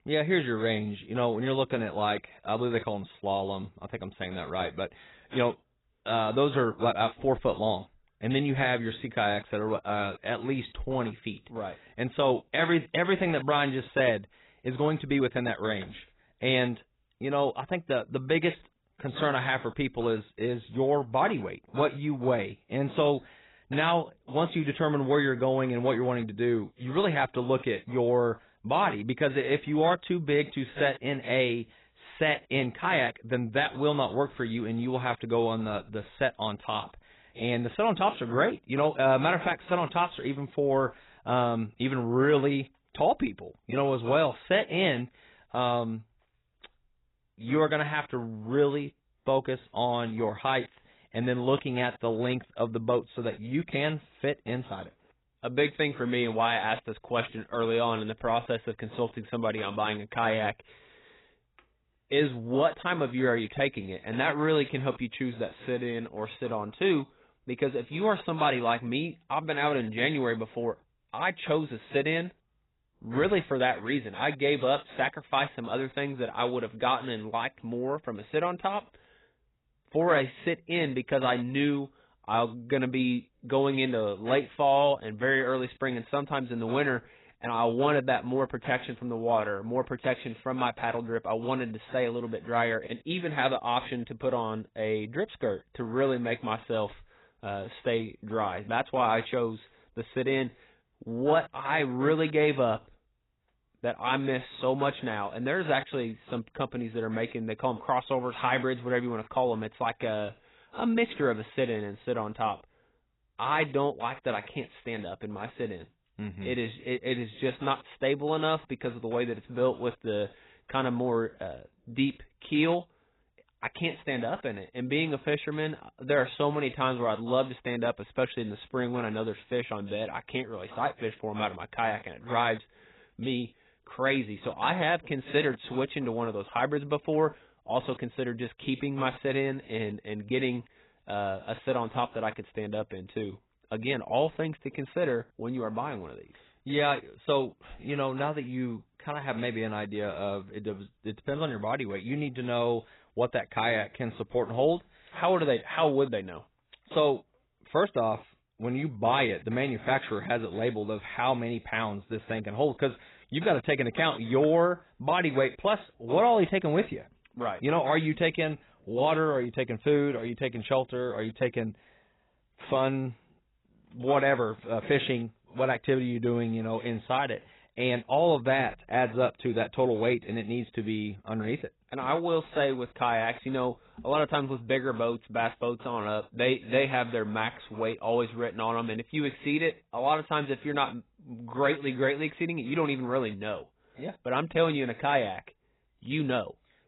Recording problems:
garbled, watery; badly; nothing above 4 kHz

